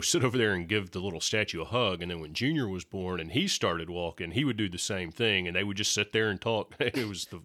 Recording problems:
abrupt cut into speech; at the start

